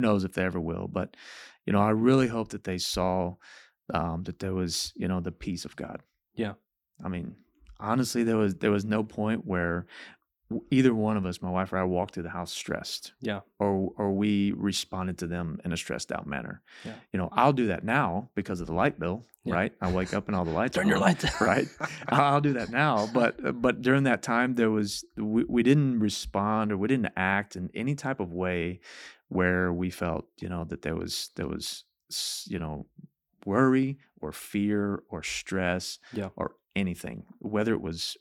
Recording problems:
abrupt cut into speech; at the start

